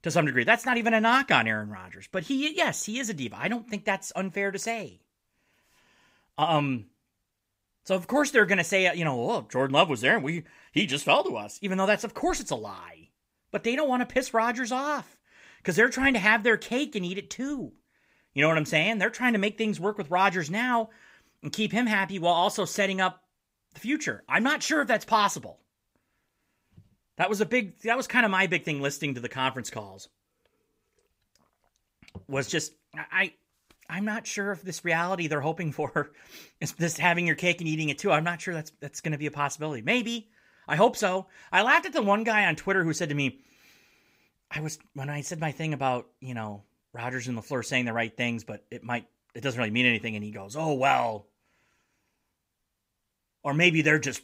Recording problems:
none

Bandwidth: 15.5 kHz